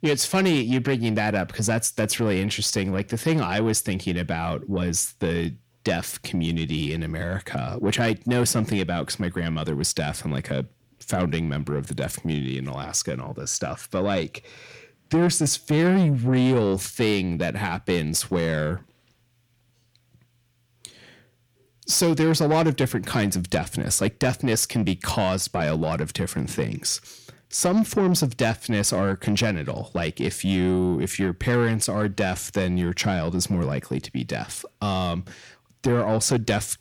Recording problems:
distortion; slight; 10 dB below the speech

